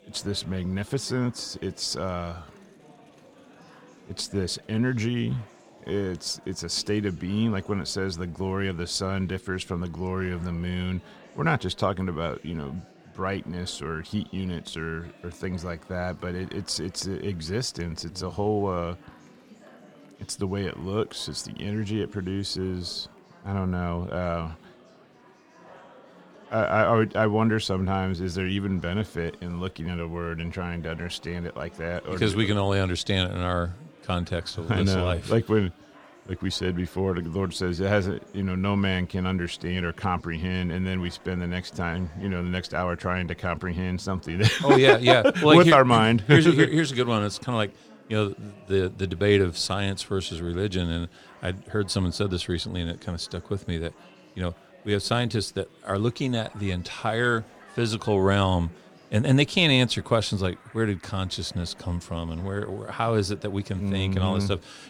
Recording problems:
chatter from many people; faint; throughout; 25 dB below the speech

